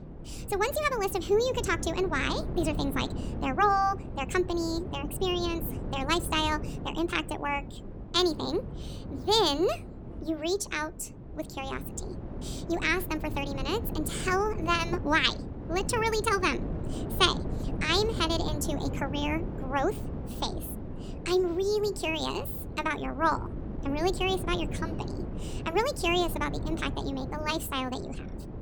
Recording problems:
wrong speed and pitch; too fast and too high; 1.5 times normal speed
wind noise on the microphone; occasional gusts; 15 dB below the speech

